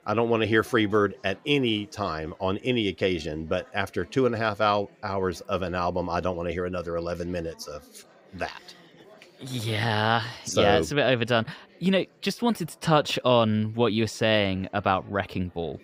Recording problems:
murmuring crowd; faint; throughout; 30 dB below the speech

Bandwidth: 15.5 kHz